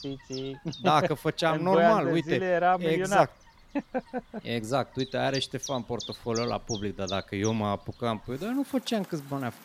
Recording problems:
animal sounds; noticeable; throughout; 15 dB below the speech

